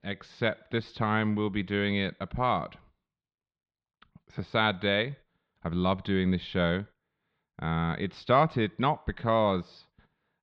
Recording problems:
muffled; slightly; fading above 4 kHz

